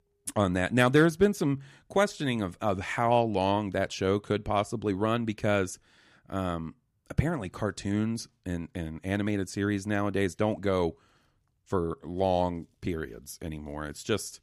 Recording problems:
none

